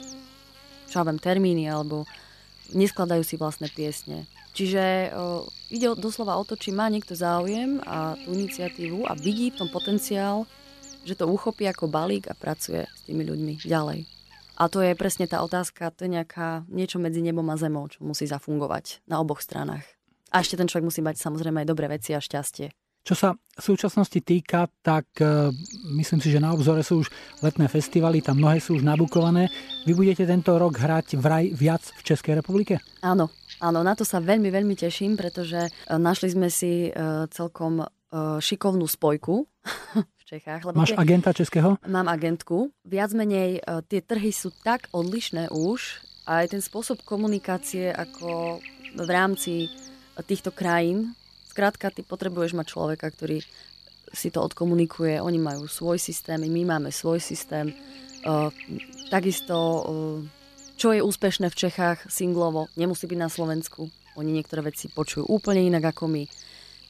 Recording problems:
electrical hum; noticeable; until 16 s, from 25 to 36 s and from 44 s on; 50 Hz, 15 dB below the speech

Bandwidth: 14 kHz